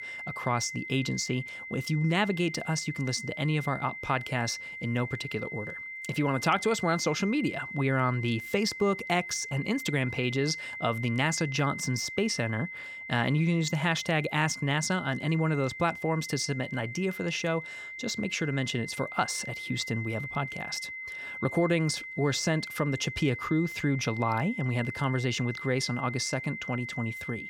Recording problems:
high-pitched whine; loud; throughout; 2 kHz, 8 dB below the speech

